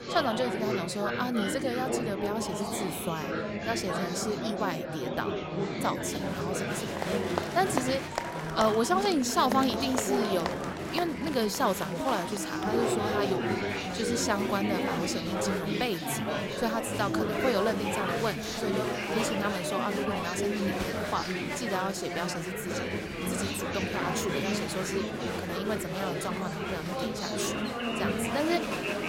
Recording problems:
chatter from many people; very loud; throughout; as loud as the speech

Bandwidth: 16 kHz